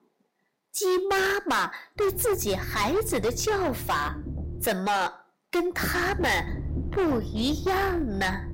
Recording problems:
distortion; heavy; 15% of the sound clipped
low rumble; noticeable; from 2 to 4.5 s and from 6 s on; 15 dB below the speech

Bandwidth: 16 kHz